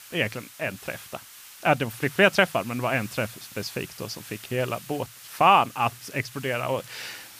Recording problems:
hiss; noticeable; throughout; 20 dB below the speech

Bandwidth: 15 kHz